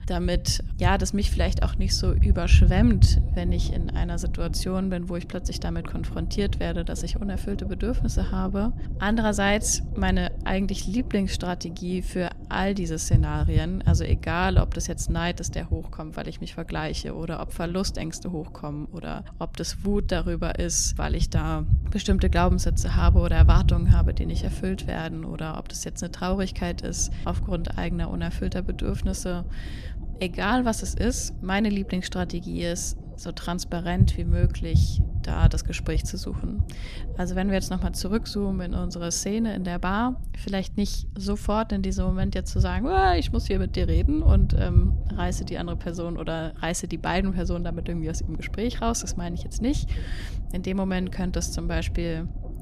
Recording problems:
low rumble; noticeable; throughout; 15 dB below the speech

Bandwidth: 14.5 kHz